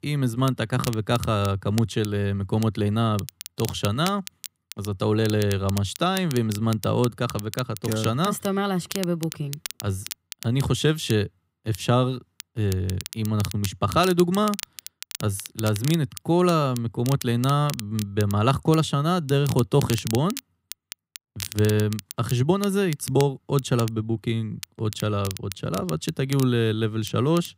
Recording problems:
crackle, like an old record; noticeable; 15 dB below the speech

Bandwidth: 15.5 kHz